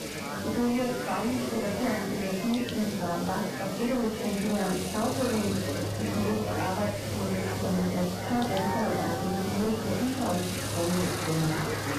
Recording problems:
off-mic speech; far
garbled, watery; badly; nothing above 3 kHz
room echo; noticeable; dies away in 0.4 s
distortion; slight; 15% of the sound clipped
machinery noise; loud; throughout; 9 dB below the speech
chatter from many people; loud; throughout; 5 dB below the speech
hiss; loud; throughout; 8 dB below the speech

